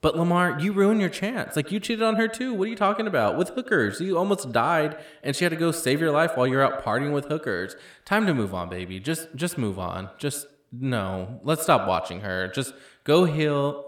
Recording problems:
echo of what is said; noticeable; throughout; 80 ms later, 15 dB below the speech

